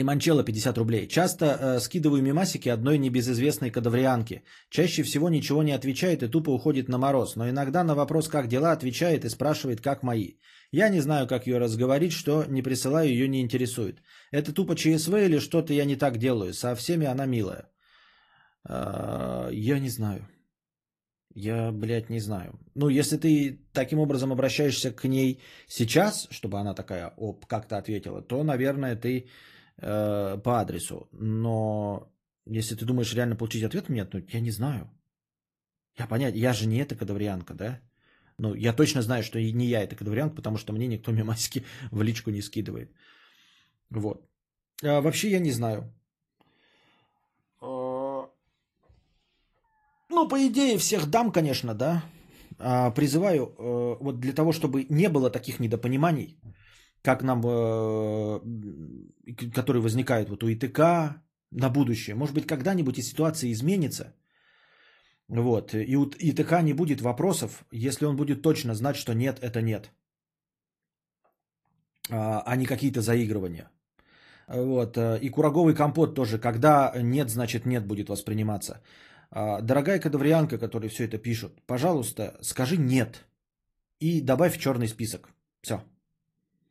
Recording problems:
garbled, watery; slightly; nothing above 14.5 kHz
abrupt cut into speech; at the start

